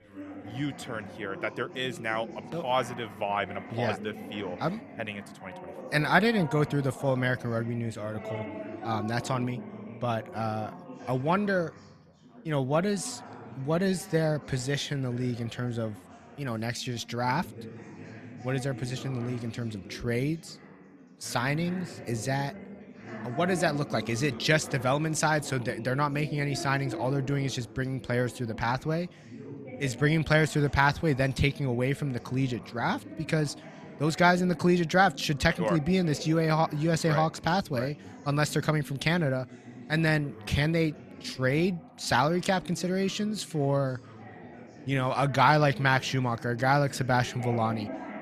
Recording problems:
background chatter; noticeable; throughout; 4 voices, 15 dB below the speech

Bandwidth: 14 kHz